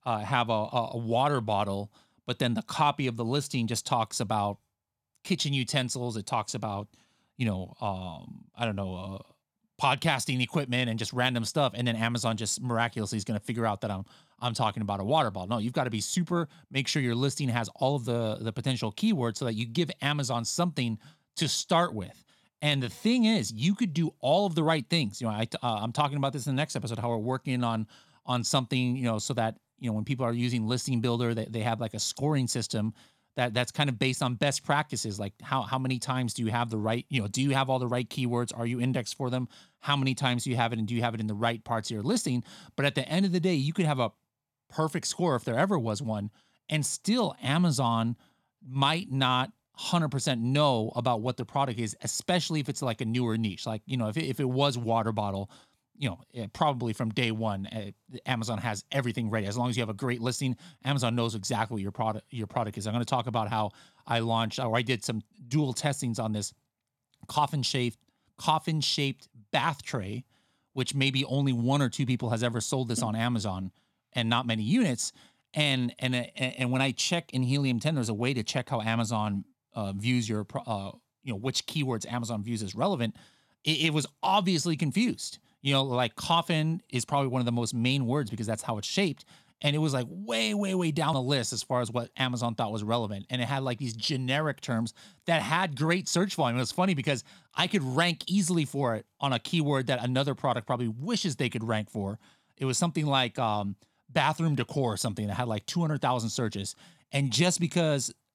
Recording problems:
none

